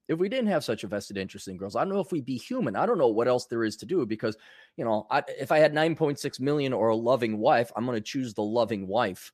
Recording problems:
none

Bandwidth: 14.5 kHz